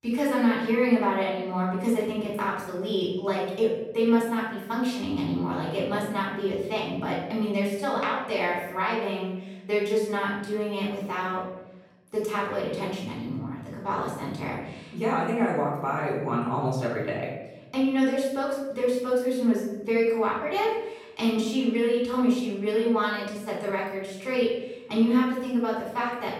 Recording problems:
off-mic speech; far
room echo; noticeable; dies away in 1 s

